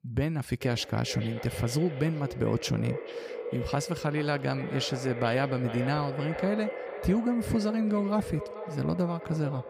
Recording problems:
echo of what is said; strong; throughout; 440 ms later, 9 dB below the speech

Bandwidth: 15.5 kHz